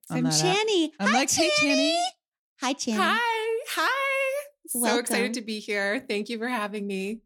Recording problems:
none

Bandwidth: 17.5 kHz